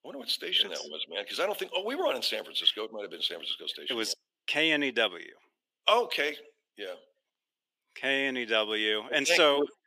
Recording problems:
thin; somewhat; fading below 350 Hz

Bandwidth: 15 kHz